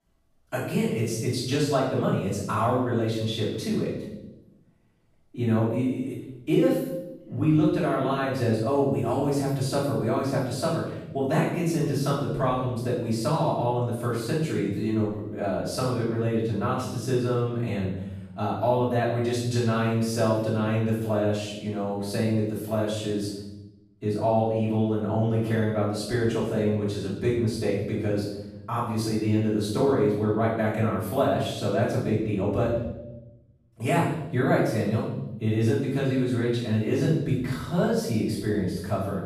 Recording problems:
off-mic speech; far
room echo; noticeable; dies away in 0.9 s

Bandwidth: 14.5 kHz